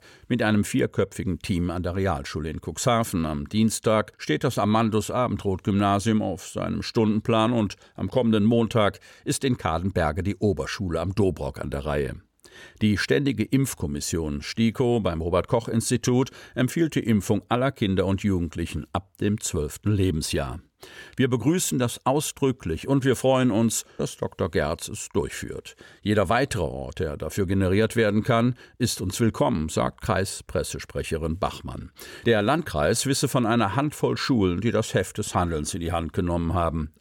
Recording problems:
none

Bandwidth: 17.5 kHz